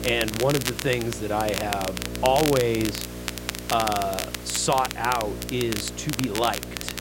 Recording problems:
crackle, like an old record; loud; 6 dB below the speech
electrical hum; noticeable; throughout; 60 Hz, 15 dB below the speech
hiss; noticeable; throughout; 15 dB below the speech
rain or running water; faint; from 5 s on; 25 dB below the speech
murmuring crowd; faint; throughout; 30 dB below the speech

